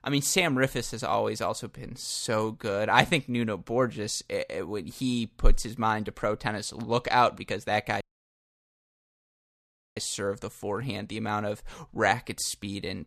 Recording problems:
audio cutting out; at 8 s for 2 s

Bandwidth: 14.5 kHz